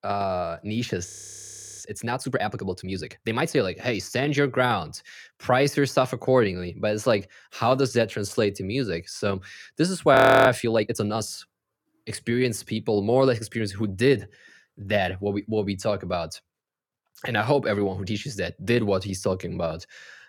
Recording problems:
audio freezing; at 1 s for 0.5 s and at 10 s

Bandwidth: 17.5 kHz